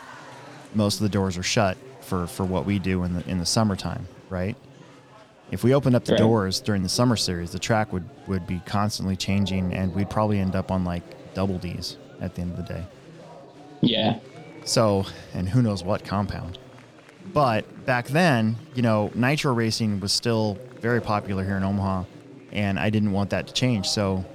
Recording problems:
chatter from many people; noticeable; throughout; 20 dB below the speech

